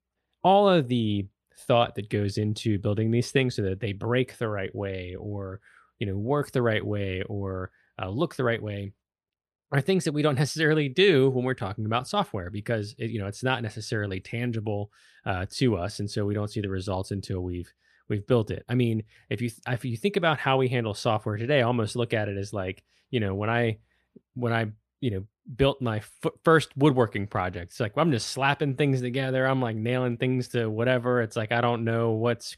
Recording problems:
none

